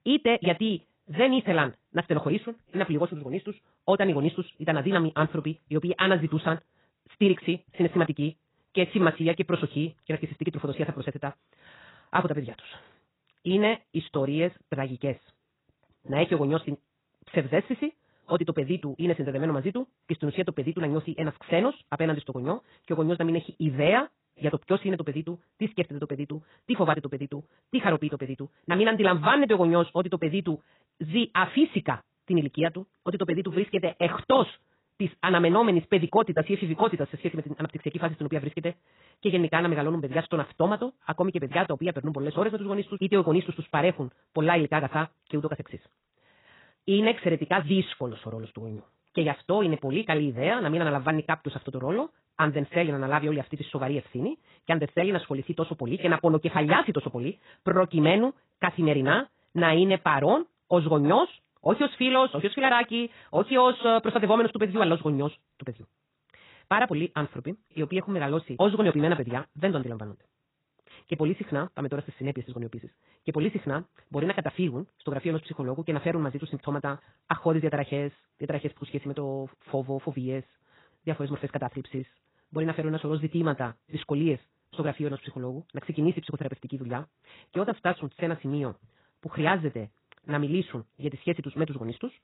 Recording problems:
garbled, watery; badly; nothing above 4 kHz
wrong speed, natural pitch; too fast; 1.8 times normal speed

